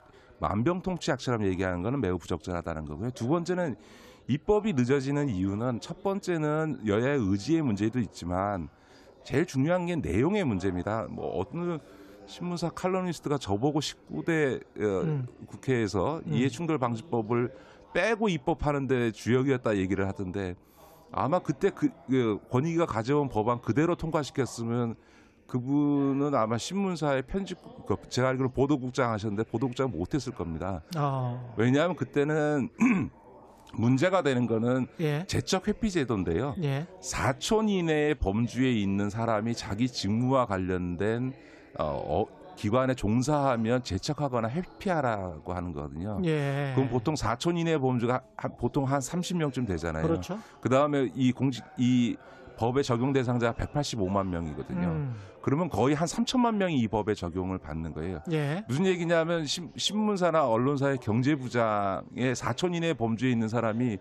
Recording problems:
background chatter; faint; throughout; 3 voices, 25 dB below the speech

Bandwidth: 14 kHz